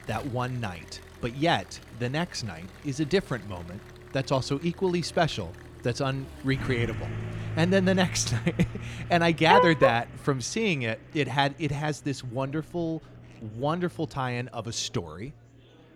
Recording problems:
traffic noise; noticeable; throughout; 15 dB below the speech
murmuring crowd; faint; throughout; 25 dB below the speech

